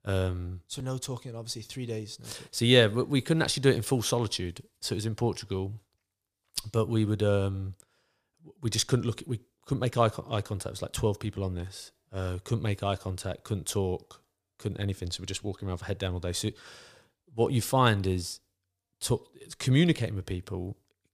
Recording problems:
none

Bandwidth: 15 kHz